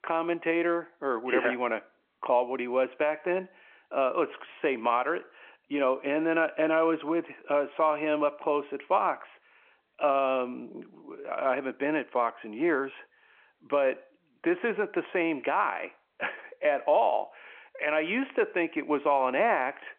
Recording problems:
phone-call audio

